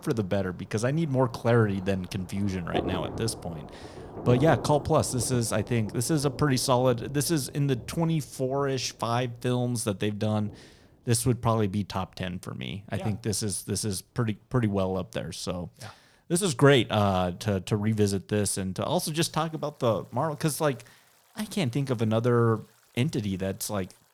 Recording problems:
rain or running water; noticeable; throughout; 15 dB below the speech

